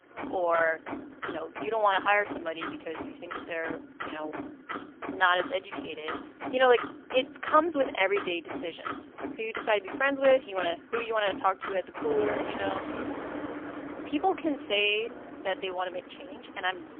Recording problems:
phone-call audio; poor line; nothing above 3 kHz
traffic noise; loud; throughout; 10 dB below the speech

